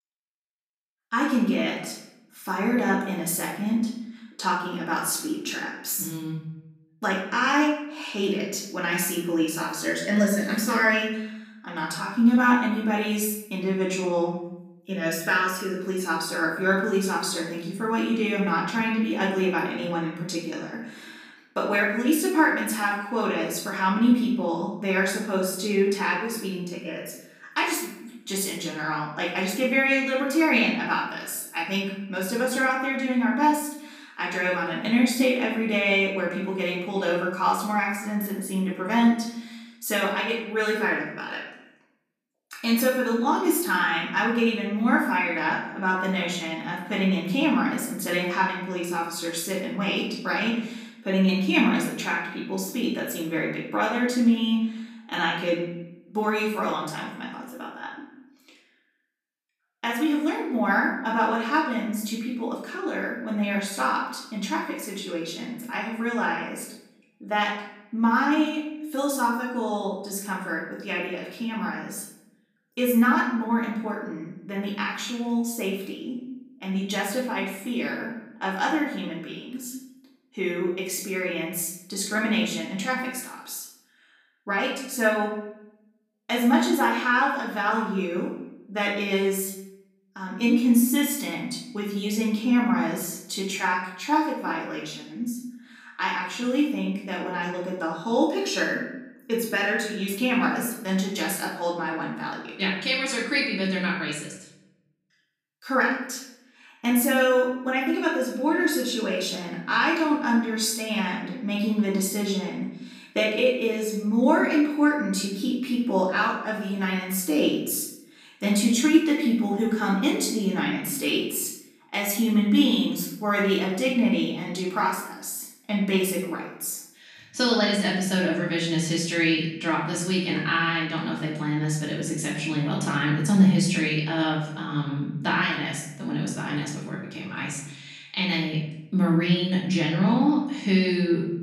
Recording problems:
off-mic speech; far
room echo; noticeable; dies away in 0.7 s

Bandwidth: 15 kHz